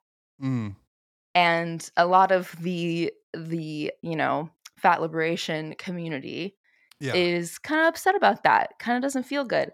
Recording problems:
none

